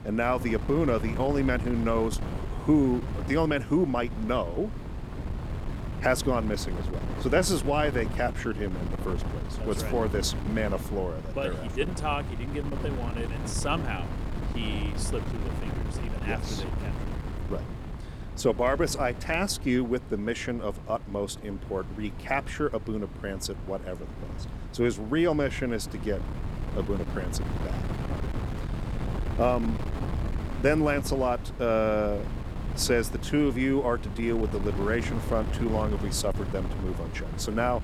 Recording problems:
wind noise on the microphone; occasional gusts; 10 dB below the speech

